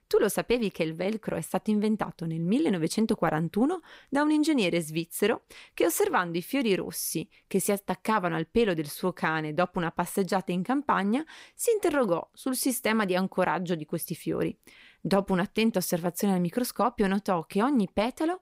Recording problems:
none

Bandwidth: 15.5 kHz